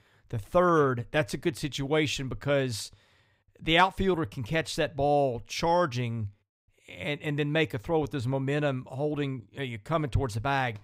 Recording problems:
none

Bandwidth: 15.5 kHz